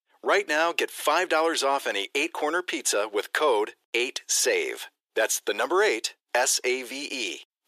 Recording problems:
thin; very; fading below 350 Hz

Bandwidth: 14.5 kHz